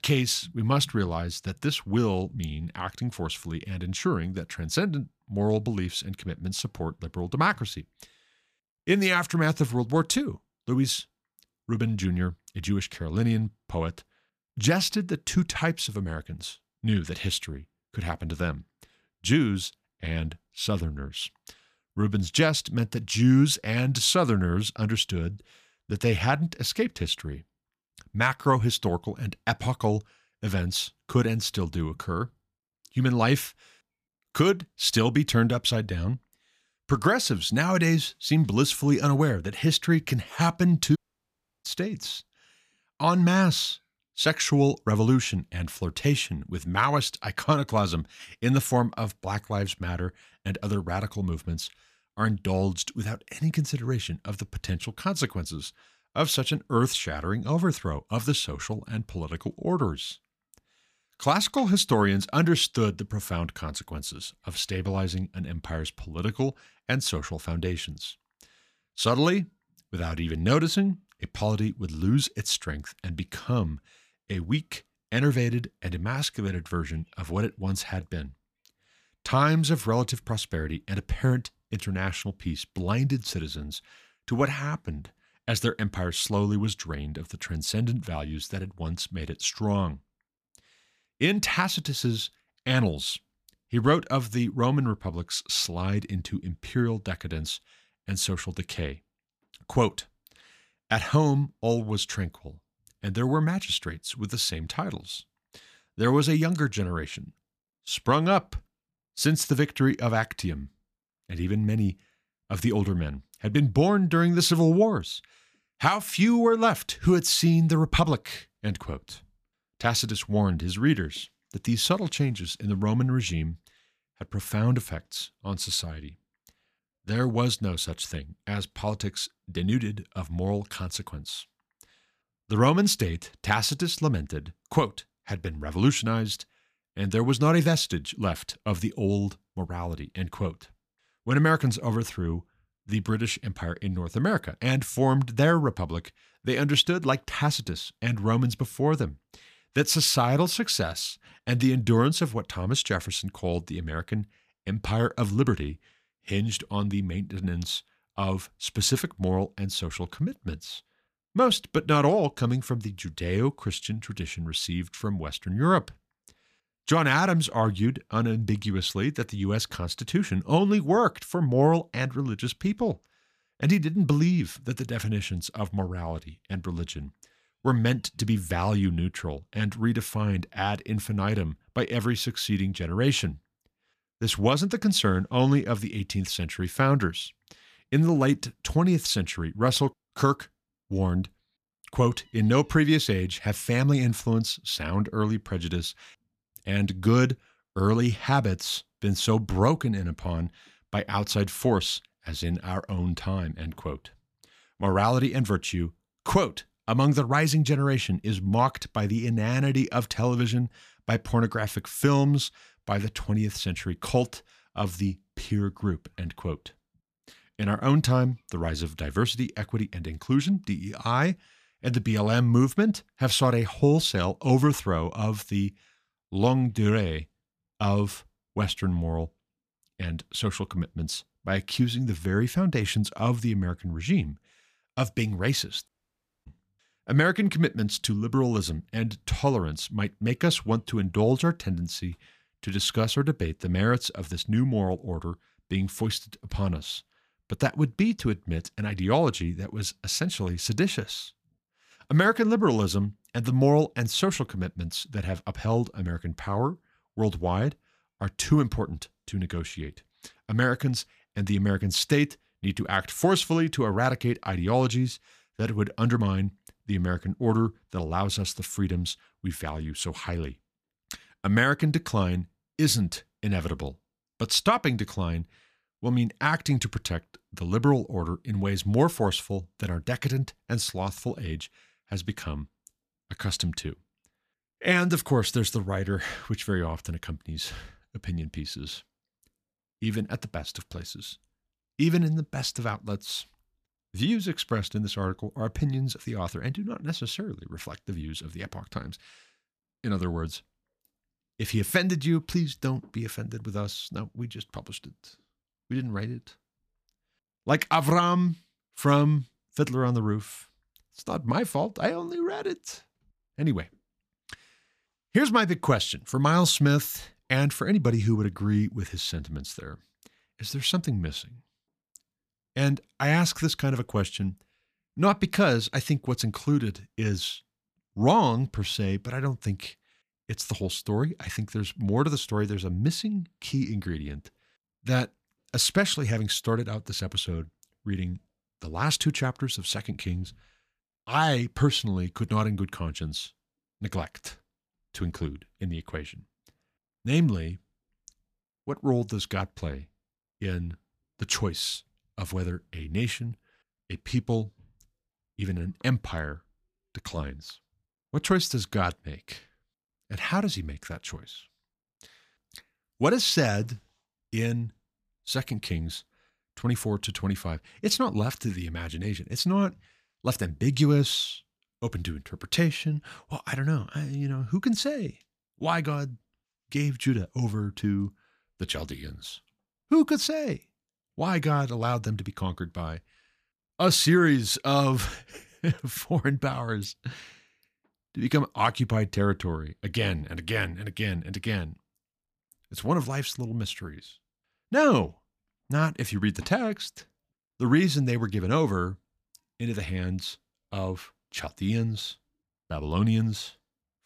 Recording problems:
audio cutting out; at 41 s for 0.5 s and at 3:56 for 0.5 s

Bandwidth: 14.5 kHz